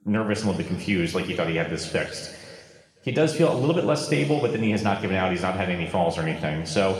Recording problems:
room echo; noticeable; dies away in 1.8 s
off-mic speech; somewhat distant

